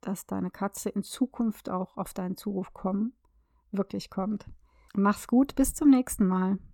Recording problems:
none

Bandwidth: 18 kHz